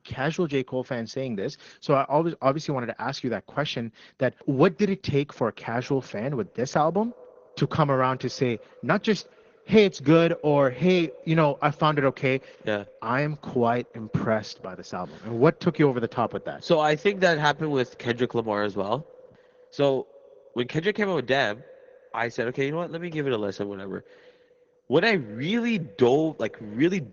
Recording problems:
echo of what is said; faint; from 5.5 s on; 120 ms later, 25 dB below the speech
garbled, watery; slightly; nothing above 6.5 kHz

